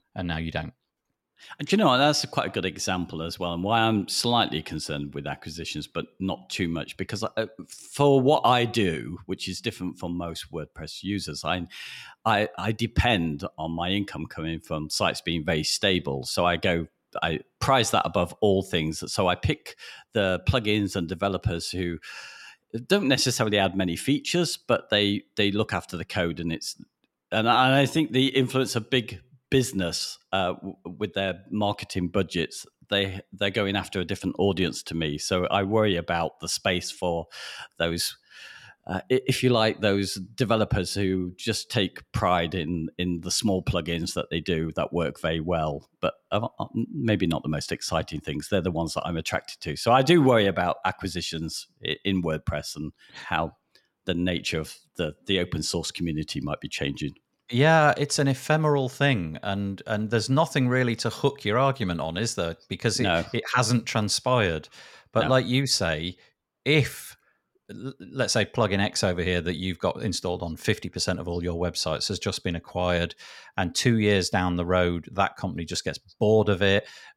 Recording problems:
none

